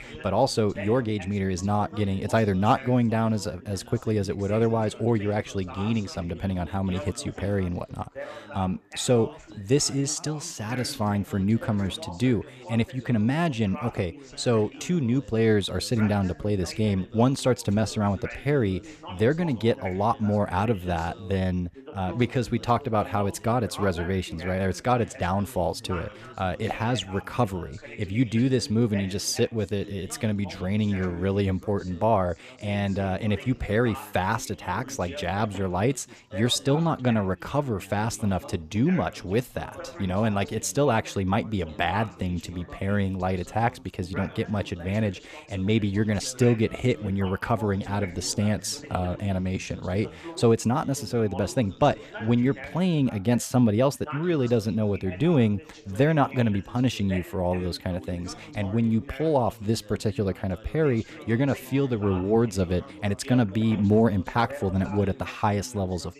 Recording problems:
background chatter; noticeable; throughout; 3 voices, 15 dB below the speech

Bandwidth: 14.5 kHz